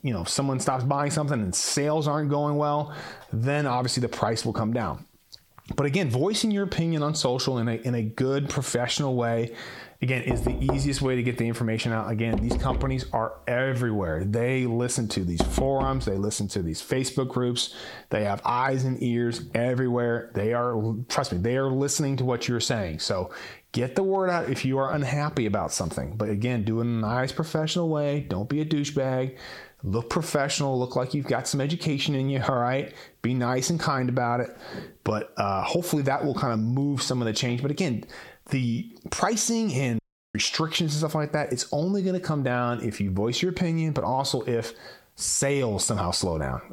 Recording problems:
squashed, flat; heavily
door banging; noticeable; from 10 to 16 s; peak 2 dB below the speech
audio cutting out; at 40 s

